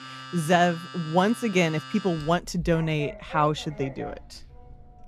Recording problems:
household noises; noticeable; throughout; 15 dB below the speech

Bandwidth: 14.5 kHz